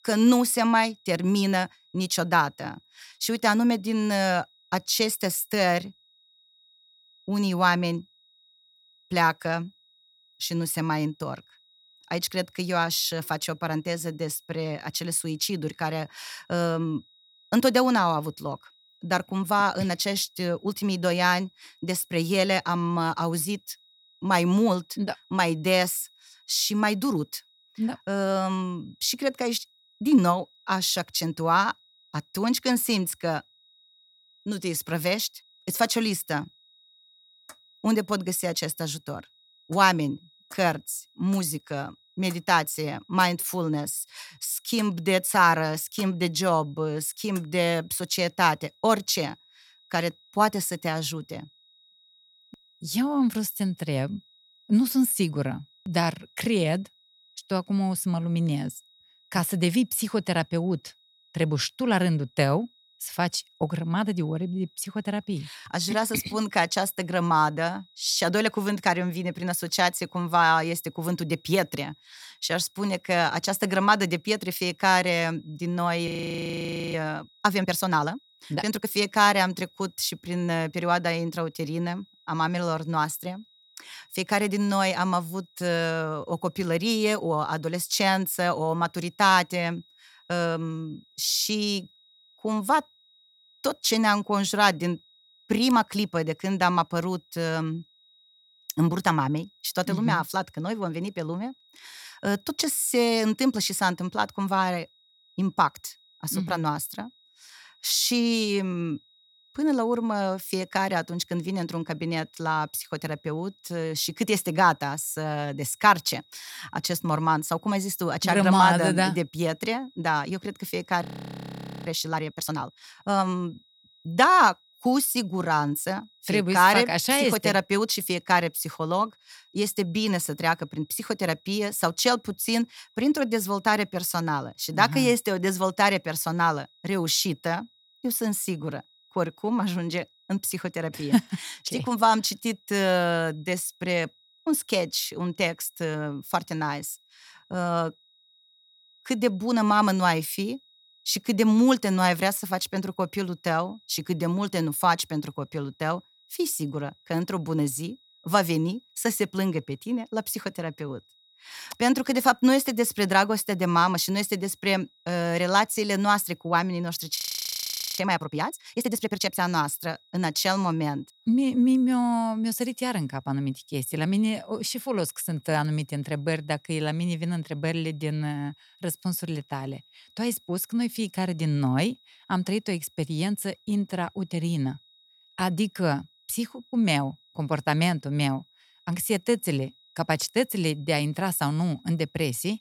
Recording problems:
high-pitched whine; faint; throughout; 4 kHz, 30 dB below the speech
audio freezing; at 1:16 for 1 s, at 2:01 for 1 s and at 2:47 for 1 s

